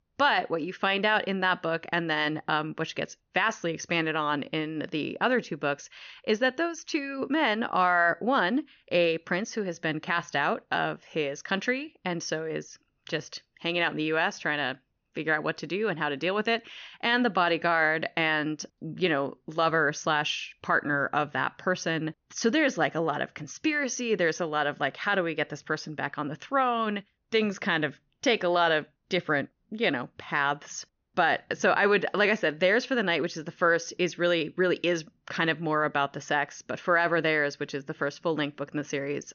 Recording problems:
high frequencies cut off; noticeable; nothing above 6.5 kHz

